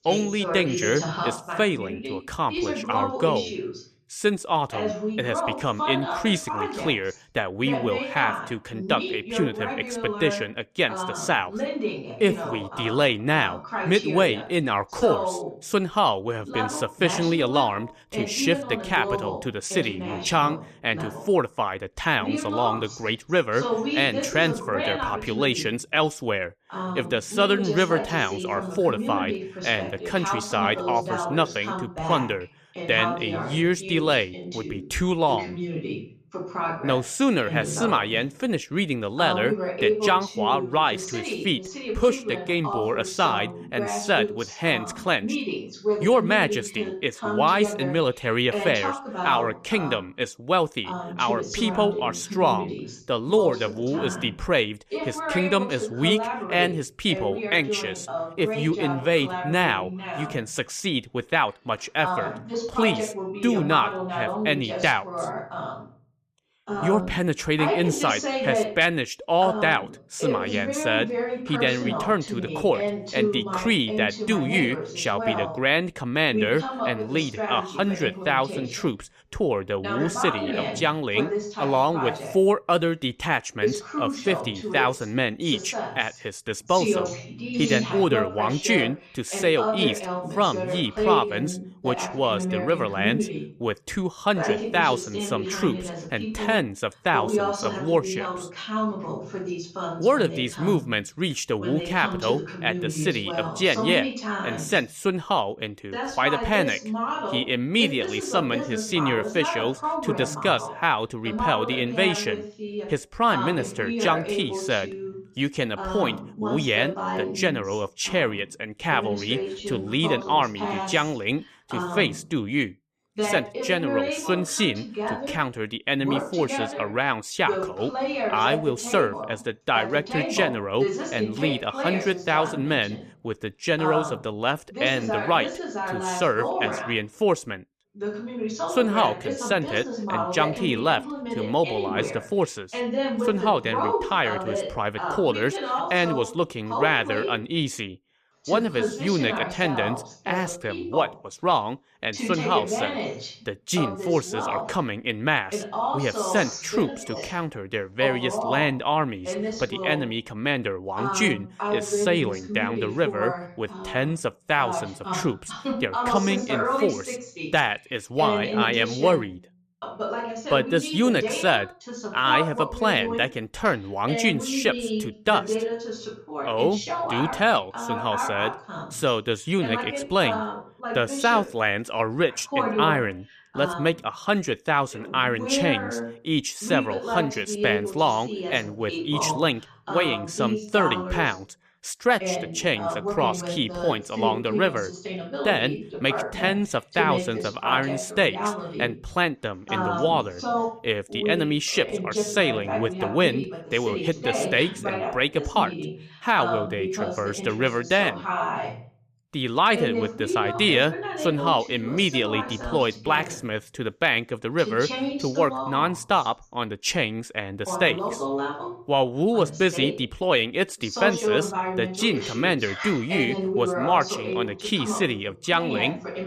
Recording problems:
voice in the background; loud; throughout; 5 dB below the speech

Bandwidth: 14.5 kHz